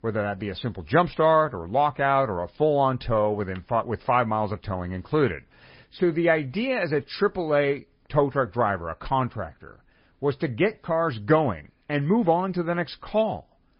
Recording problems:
garbled, watery; slightly; nothing above 5 kHz
high frequencies cut off; slight

